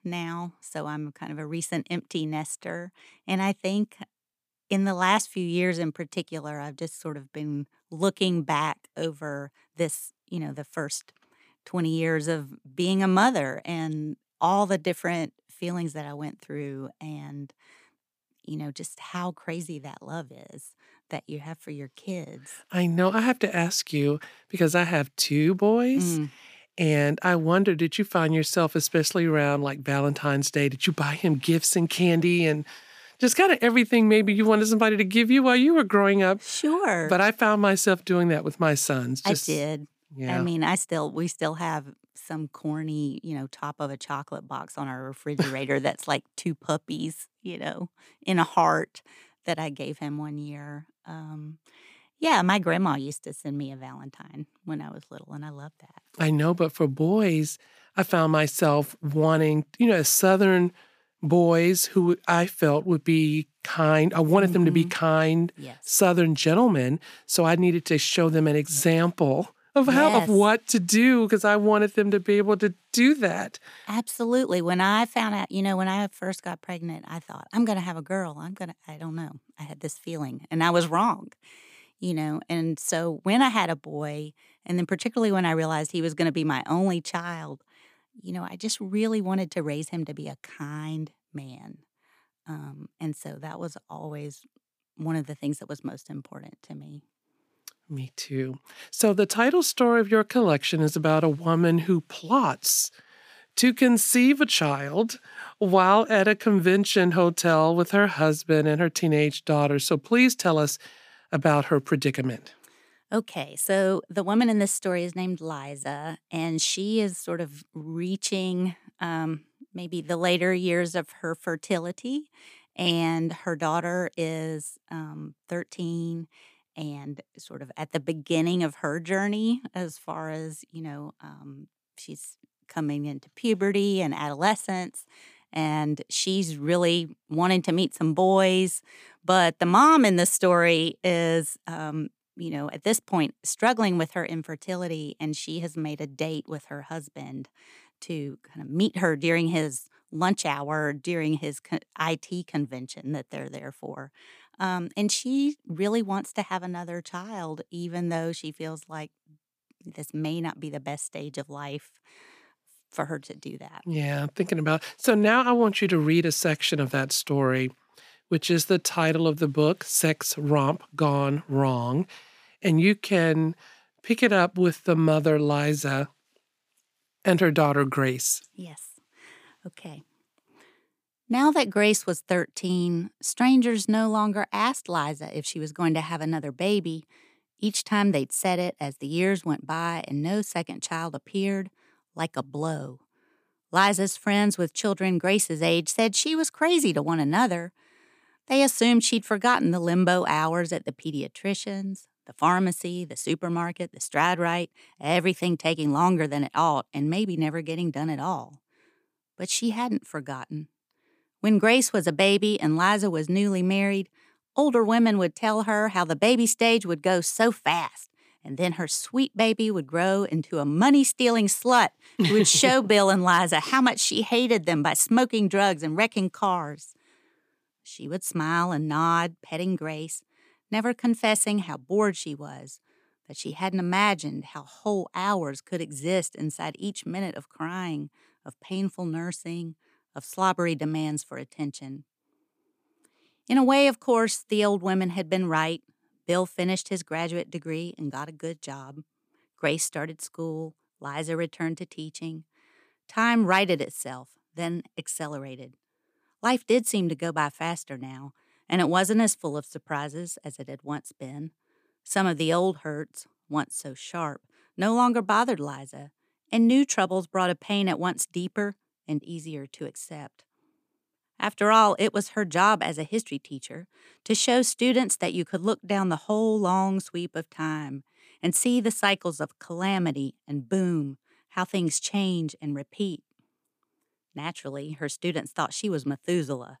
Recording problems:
uneven, jittery; strongly; from 25 s to 2:46

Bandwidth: 15 kHz